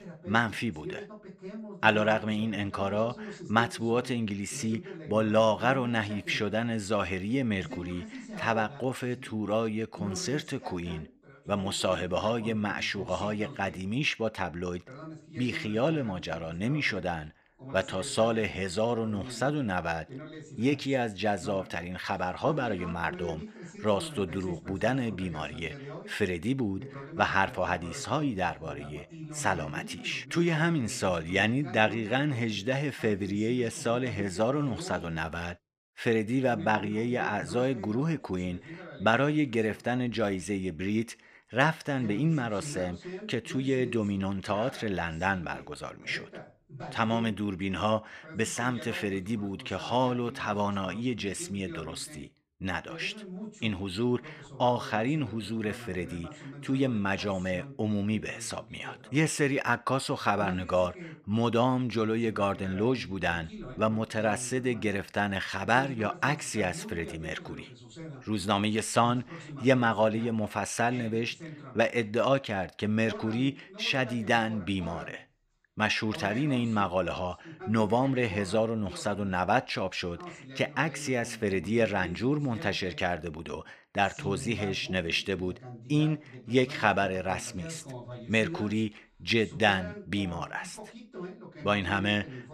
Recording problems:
voice in the background; noticeable; throughout; 15 dB below the speech

